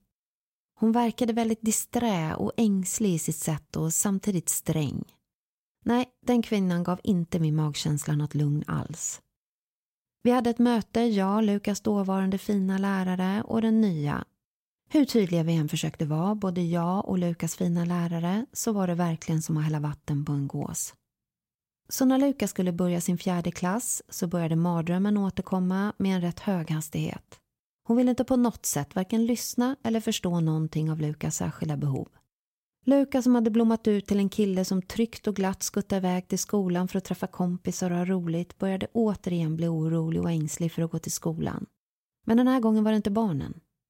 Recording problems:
none

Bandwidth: 16 kHz